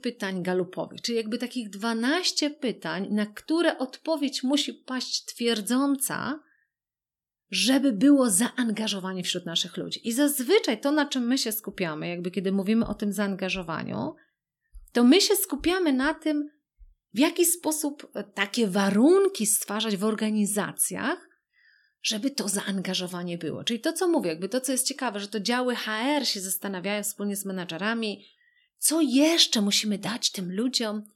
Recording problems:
none

